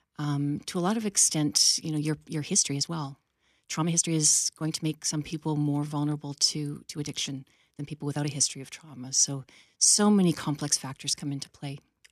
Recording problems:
uneven, jittery; strongly; from 1 to 10 s

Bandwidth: 14.5 kHz